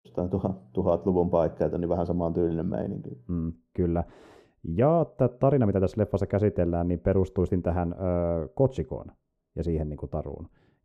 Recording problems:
muffled; very; fading above 1 kHz

